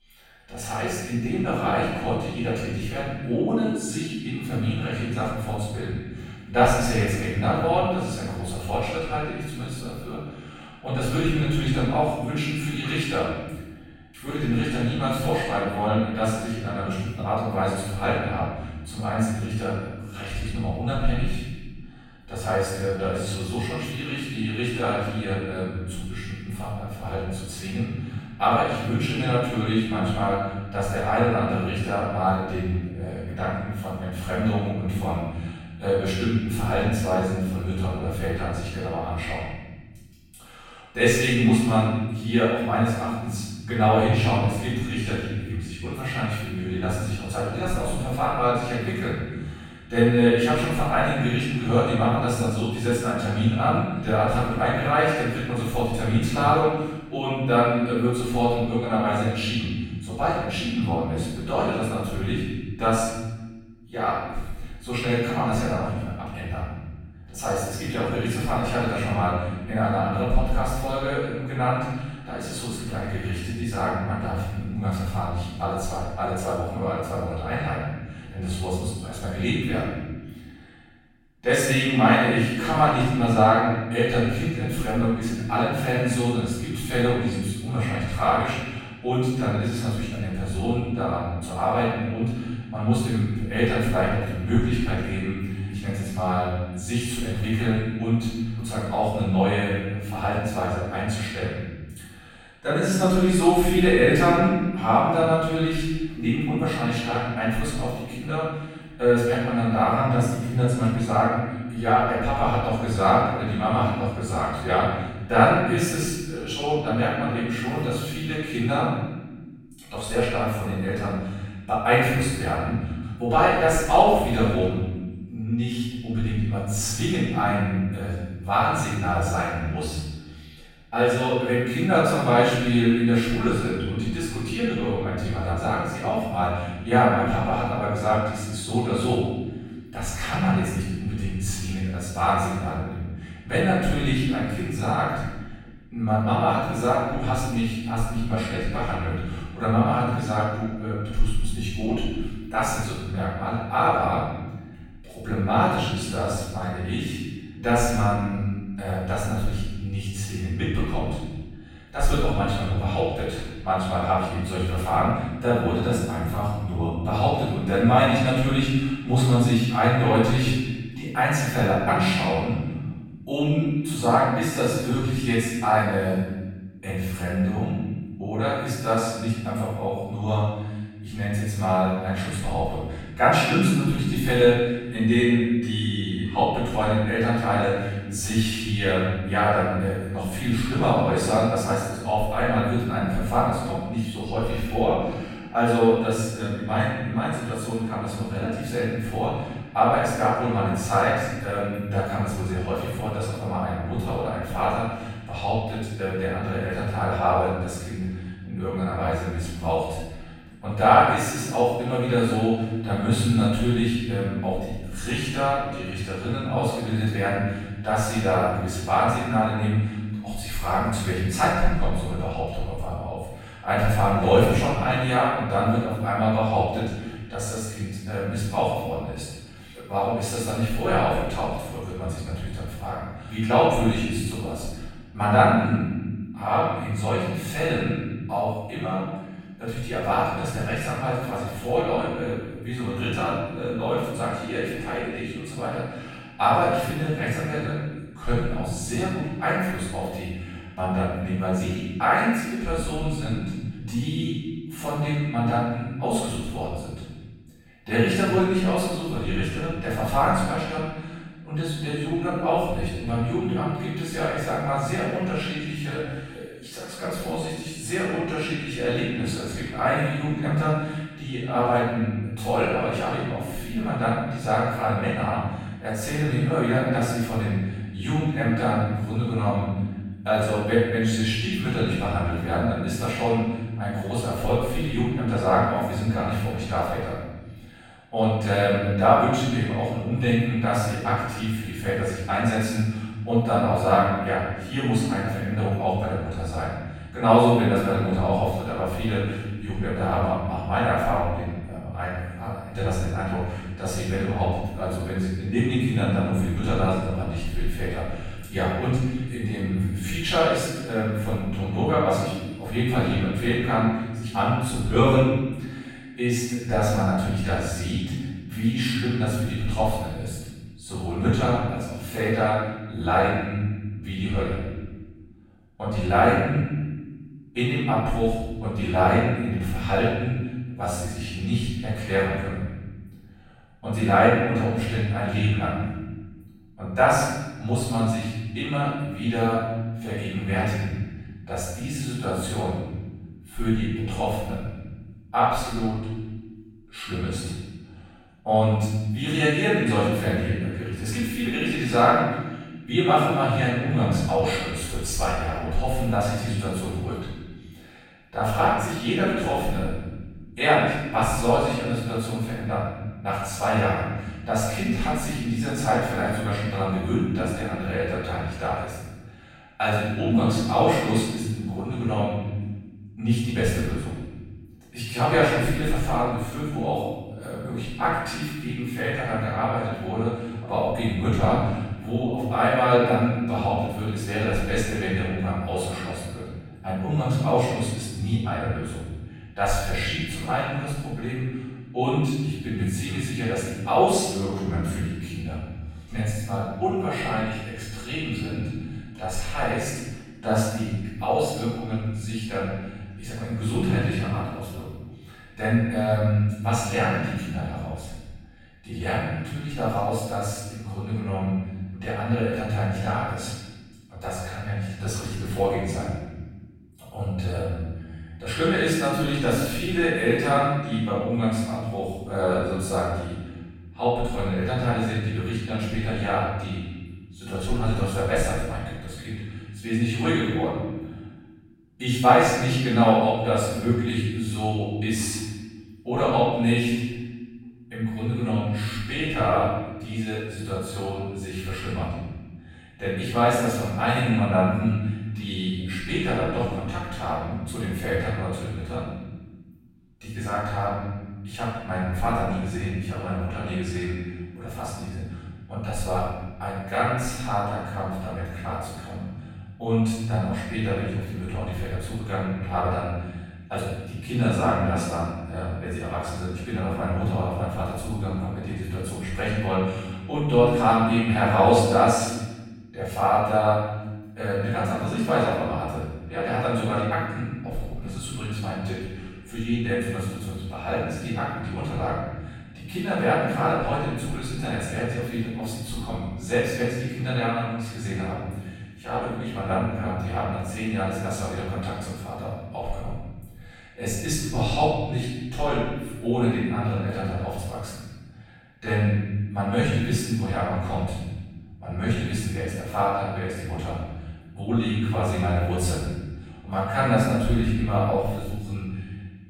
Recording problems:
room echo; strong; dies away in 1.4 s
off-mic speech; far

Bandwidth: 16.5 kHz